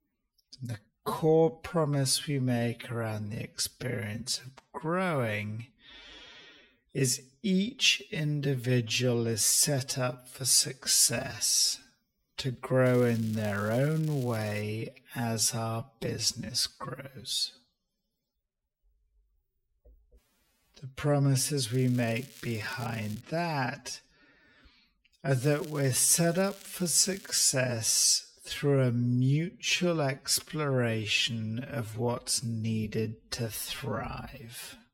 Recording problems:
wrong speed, natural pitch; too slow; 0.5 times normal speed
crackling; faint; from 13 to 15 s, from 22 to 23 s and from 25 to 27 s; 20 dB below the speech

